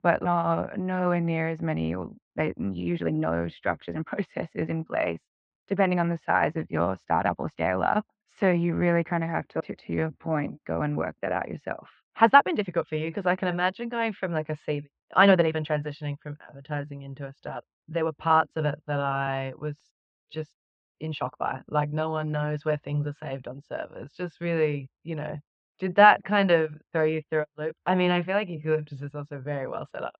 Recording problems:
muffled; very; fading above 3 kHz
uneven, jittery; strongly; from 2 to 29 s

